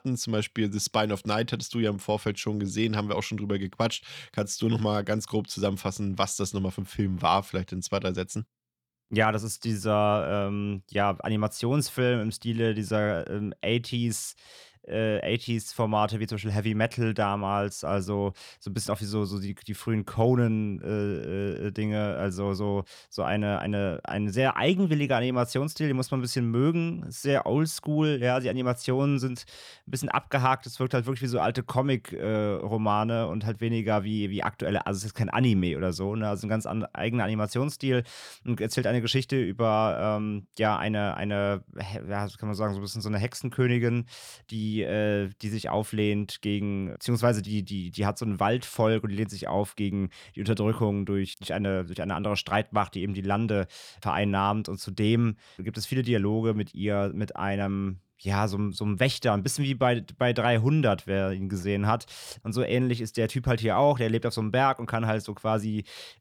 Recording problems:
none

